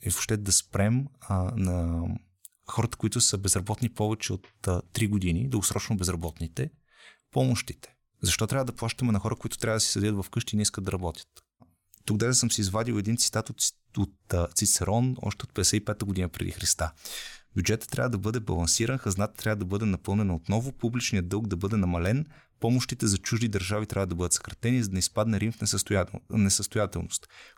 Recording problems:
none

